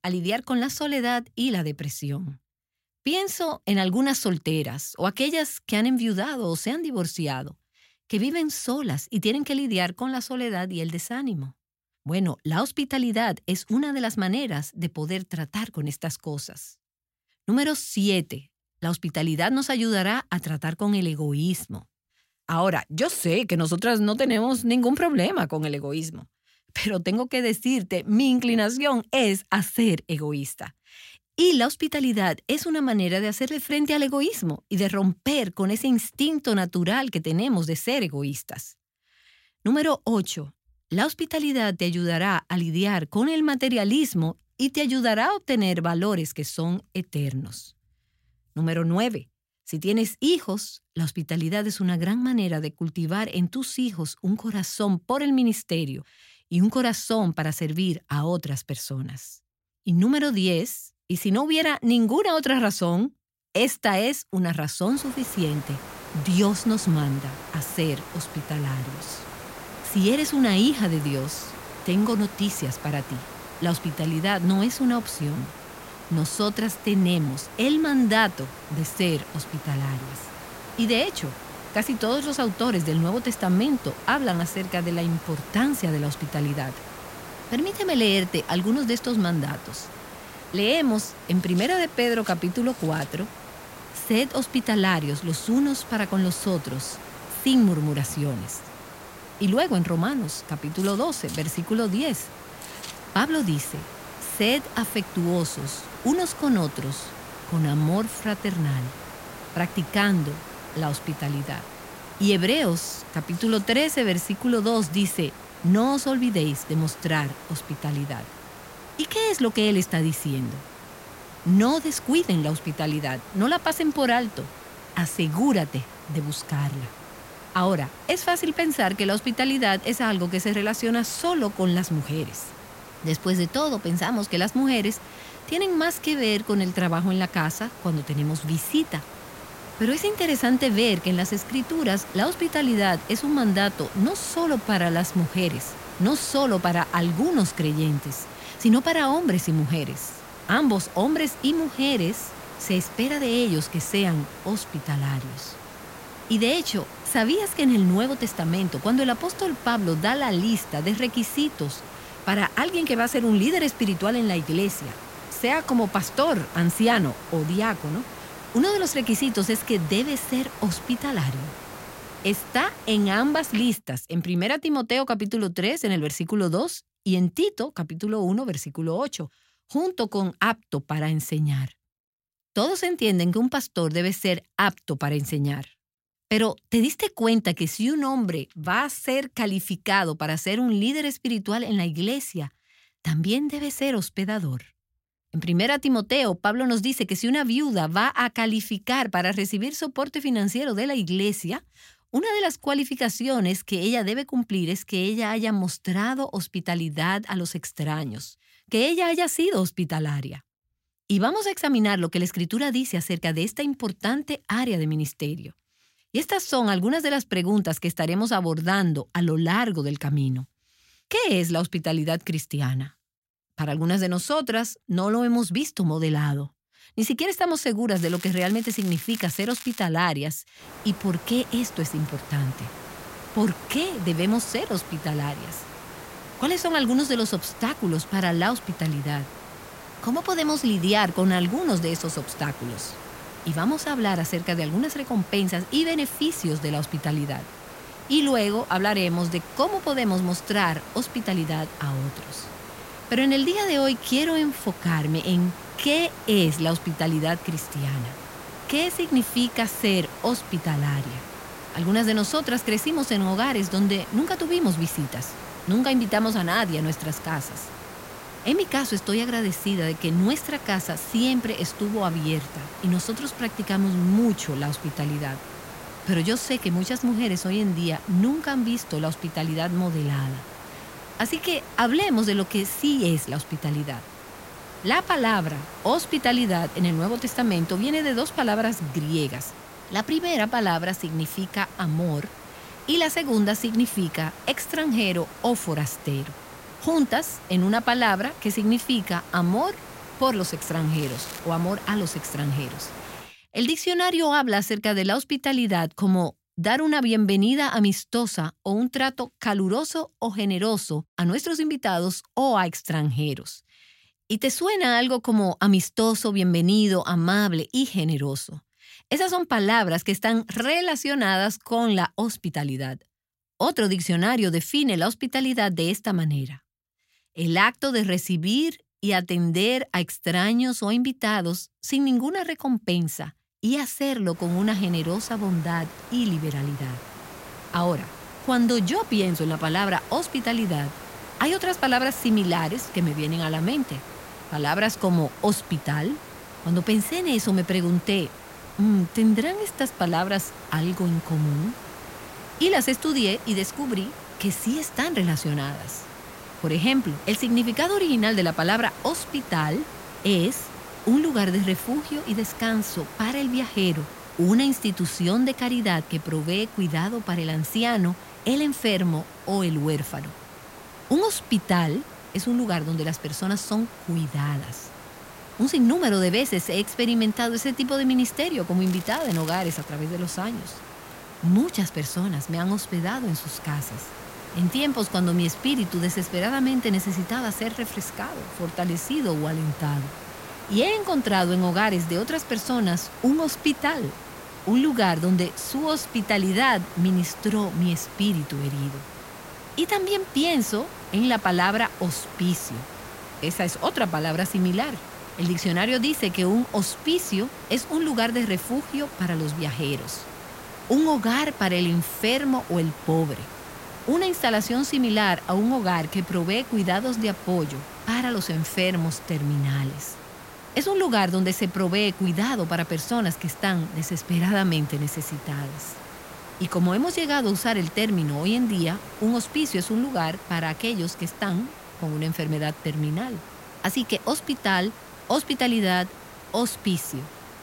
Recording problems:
hiss; noticeable; from 1:05 to 2:54, from 3:51 to 5:03 and from 5:34 on; 15 dB below the speech
crackling; noticeable; from 3:48 to 3:50, at 5:01 and at 6:19; 15 dB below the speech

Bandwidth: 16 kHz